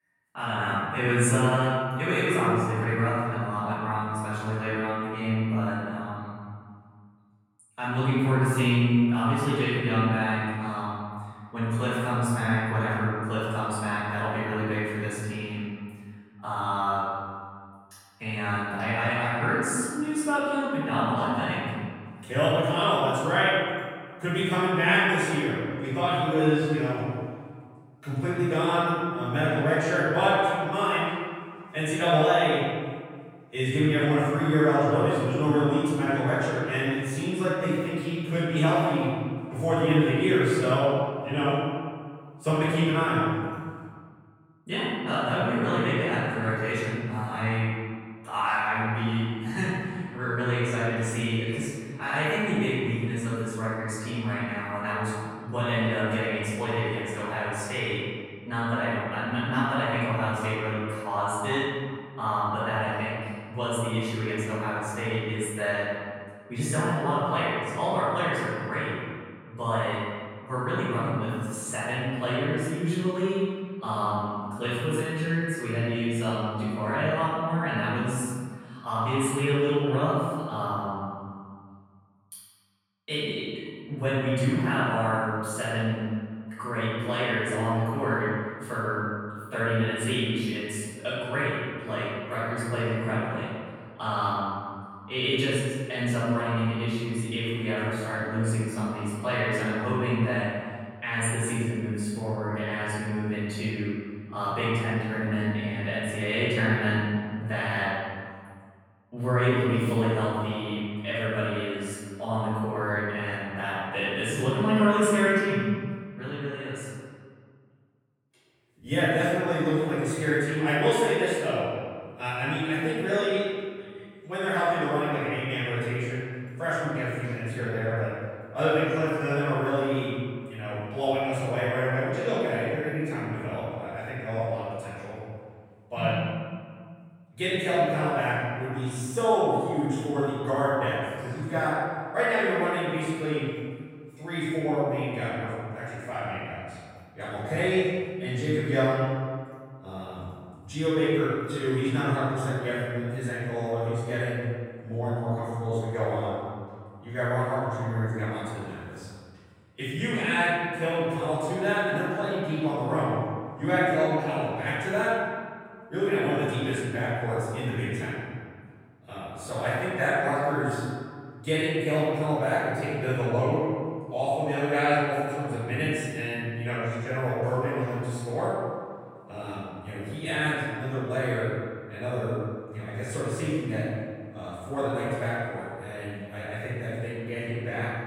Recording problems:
room echo; strong; dies away in 1.8 s
off-mic speech; far

